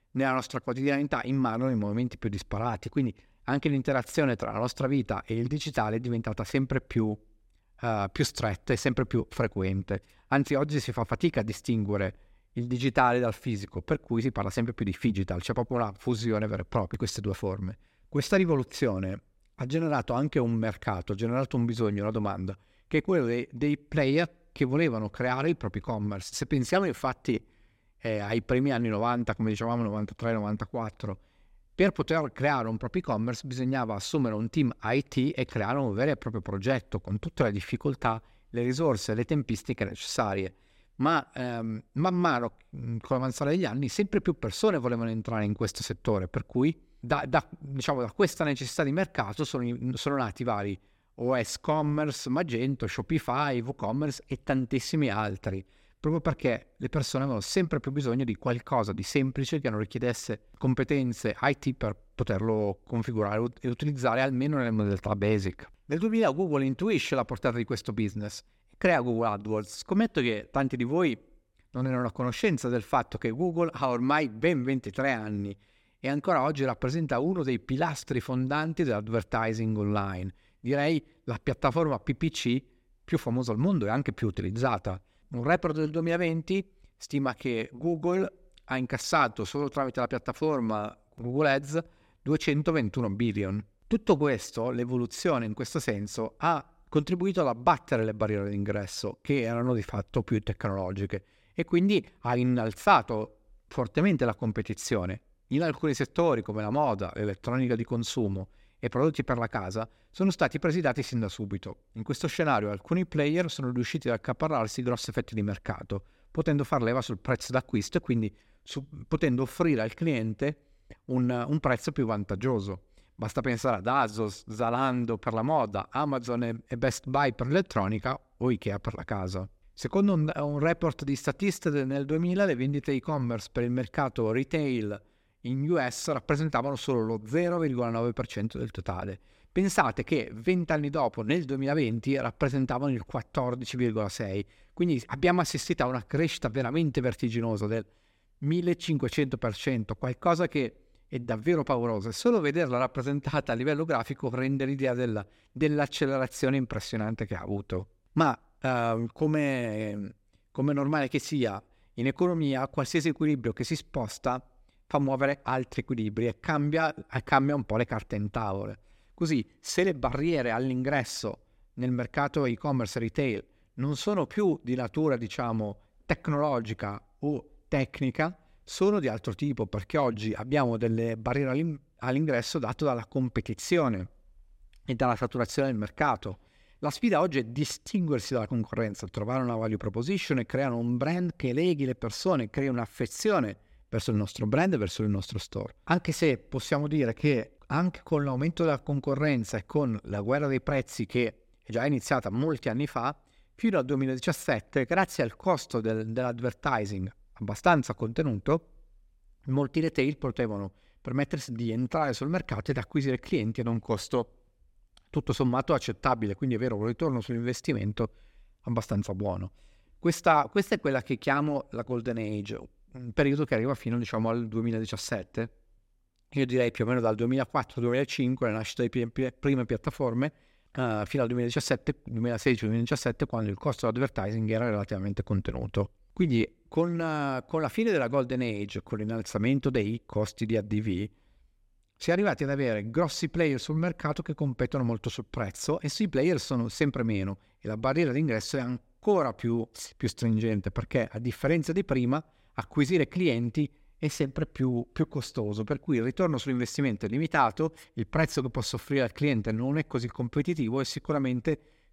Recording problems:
none

